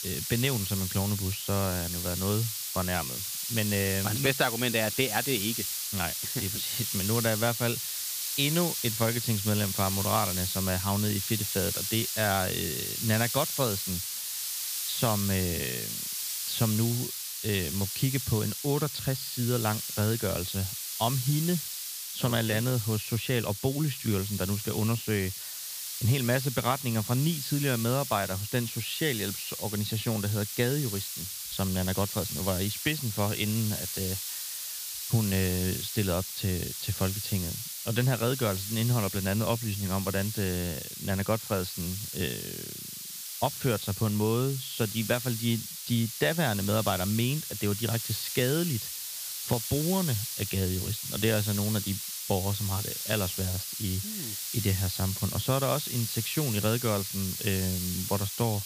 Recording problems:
high frequencies cut off; noticeable; nothing above 5.5 kHz
hiss; loud; throughout; 3 dB below the speech

